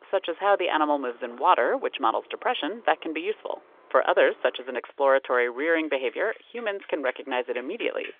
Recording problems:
phone-call audio; nothing above 3.5 kHz
traffic noise; faint; throughout; 25 dB below the speech

